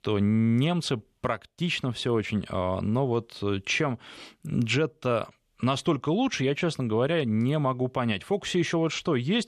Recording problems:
none

